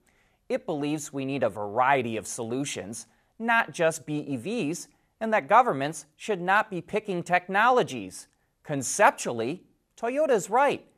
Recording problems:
none

